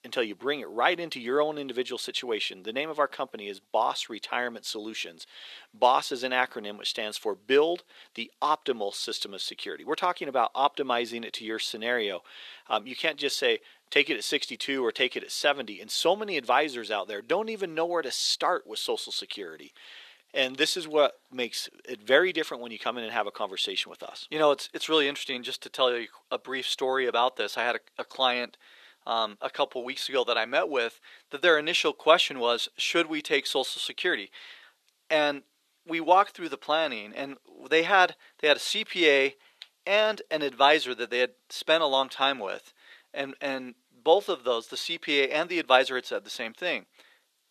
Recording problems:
thin; very; fading below 450 Hz

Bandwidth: 13.5 kHz